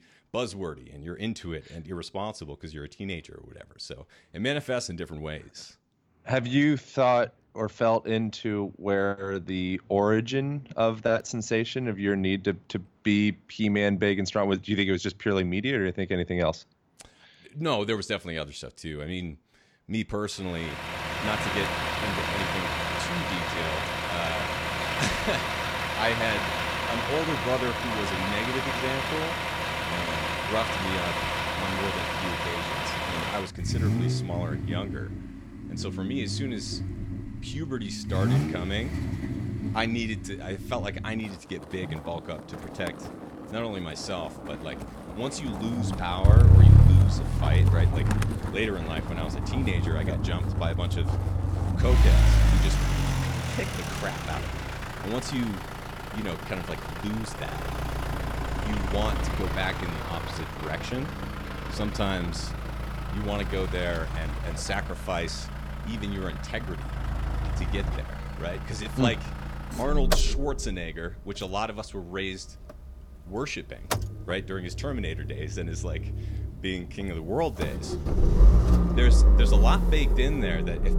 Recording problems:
traffic noise; very loud; from 21 s on; 4 dB above the speech

